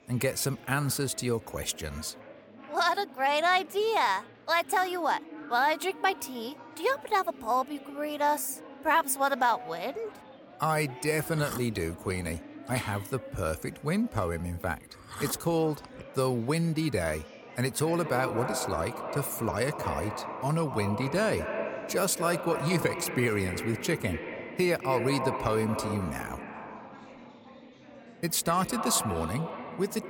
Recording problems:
echo of what is said; strong; from 18 s on; 220 ms later, 7 dB below the speech
chatter from many people; noticeable; throughout; 20 dB below the speech

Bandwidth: 17 kHz